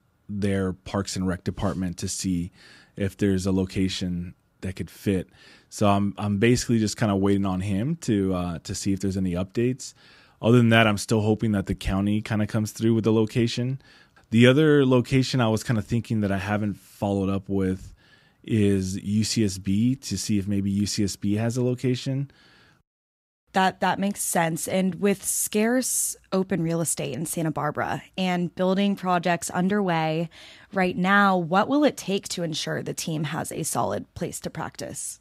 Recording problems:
none

